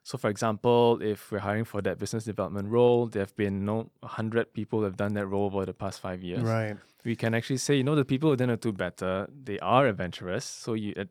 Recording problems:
none

